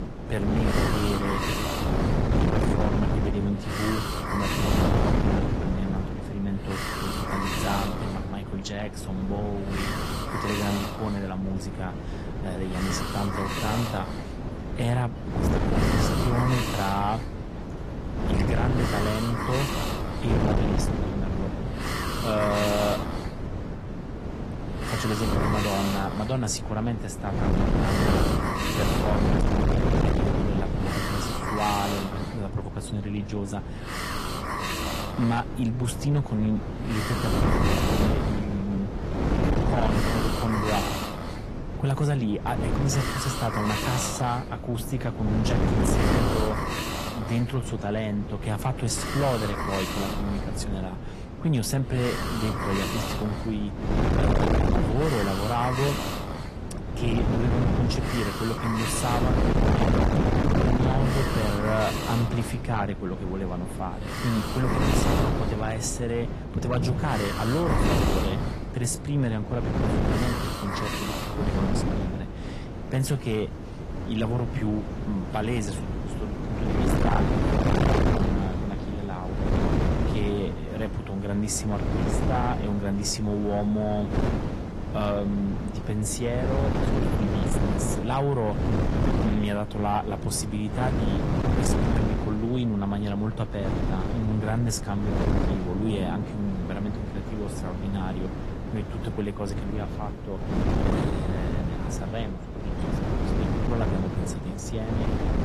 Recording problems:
distortion; heavy; 7 dB below the speech
garbled, watery; slightly; nothing above 12 kHz
wind noise on the microphone; heavy; 1 dB below the speech
hiss; loud; until 1:13; 3 dB below the speech
rain or running water; noticeable; throughout; 20 dB below the speech

